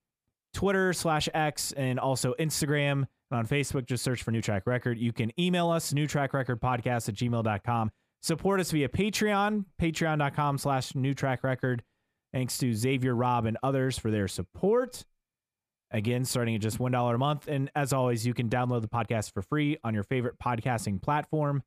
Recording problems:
uneven, jittery; slightly; from 4.5 to 19 s

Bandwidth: 15 kHz